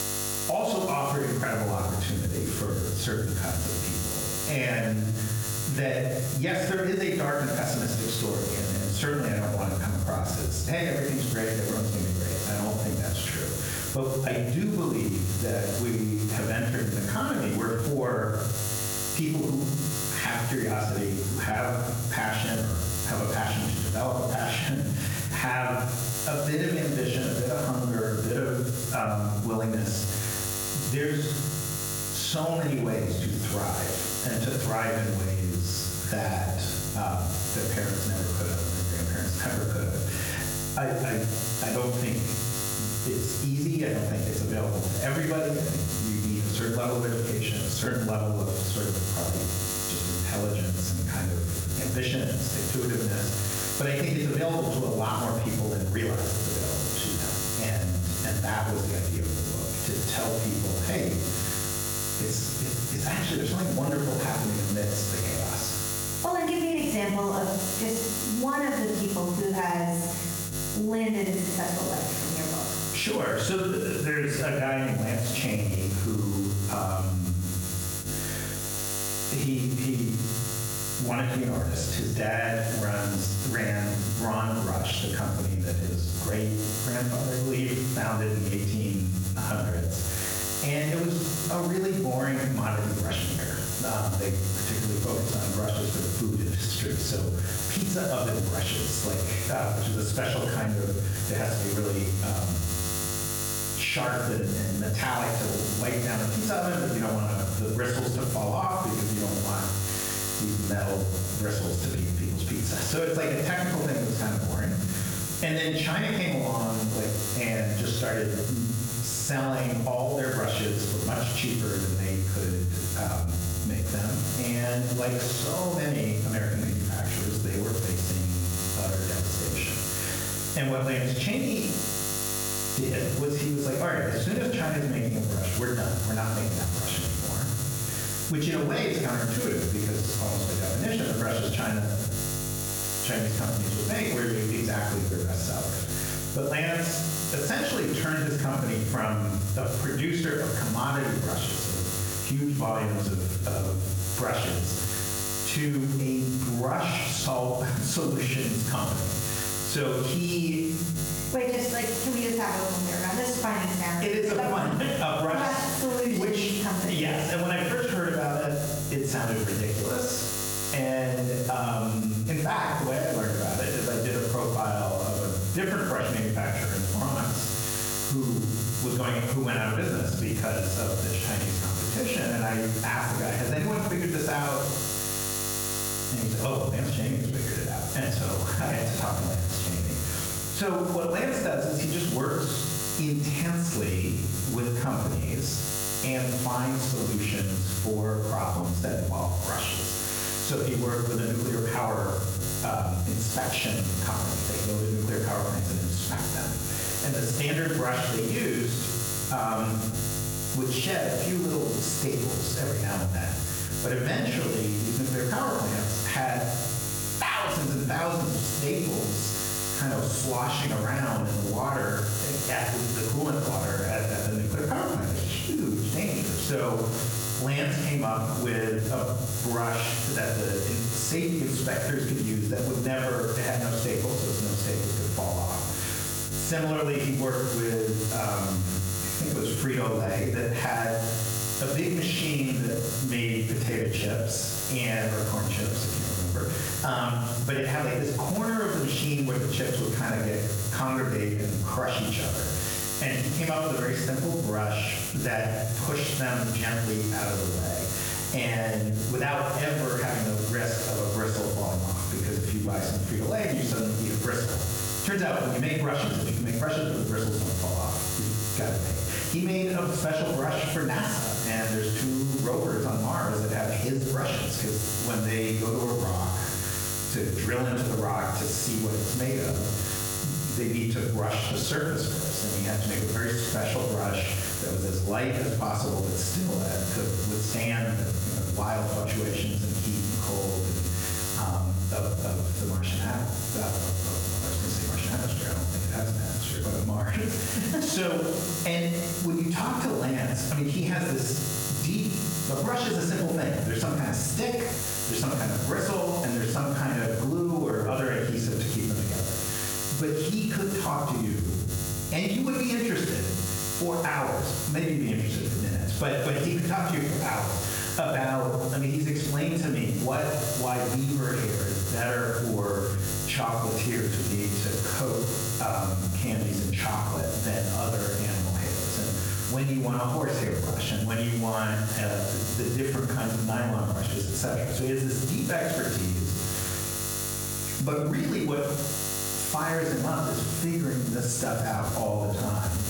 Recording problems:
off-mic speech; far
room echo; noticeable; dies away in 0.7 s
squashed, flat; somewhat
electrical hum; loud; throughout; 50 Hz, 5 dB below the speech

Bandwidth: 18 kHz